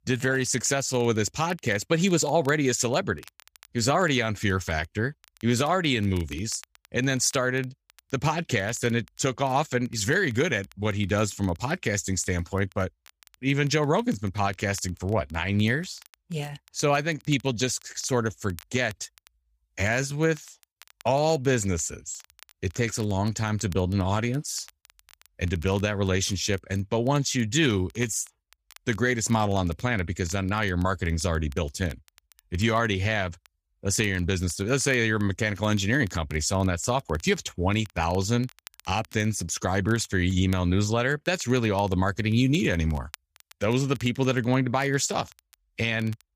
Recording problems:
crackle, like an old record; faint; 25 dB below the speech

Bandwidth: 15 kHz